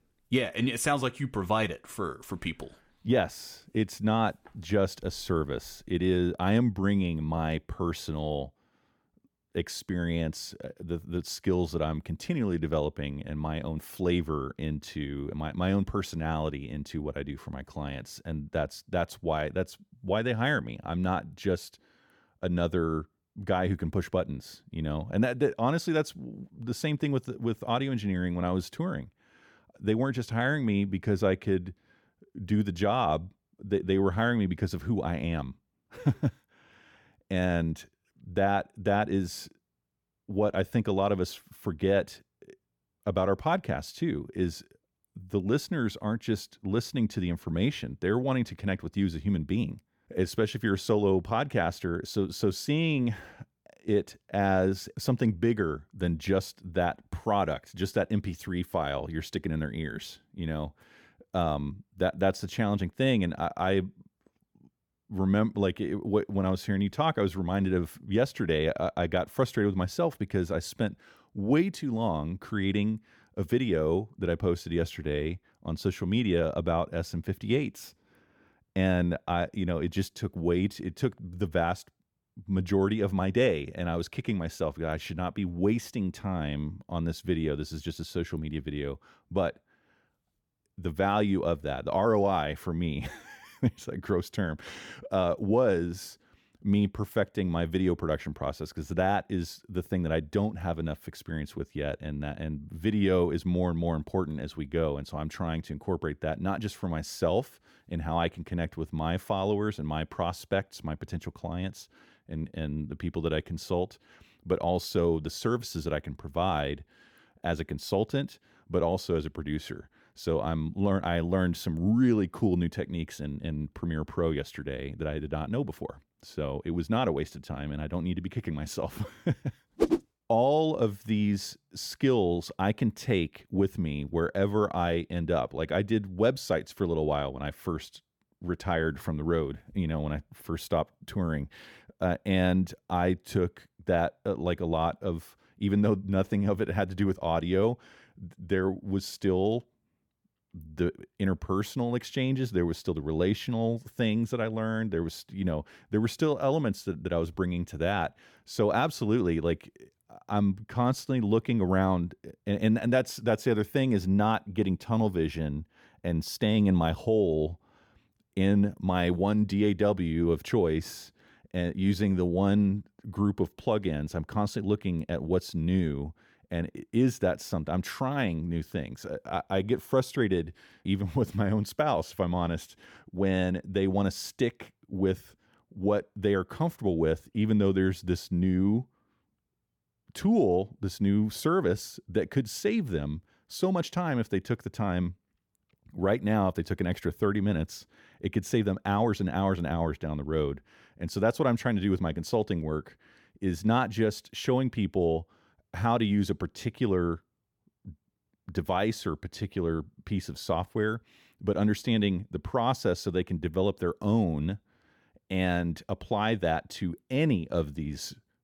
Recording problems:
none

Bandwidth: 18 kHz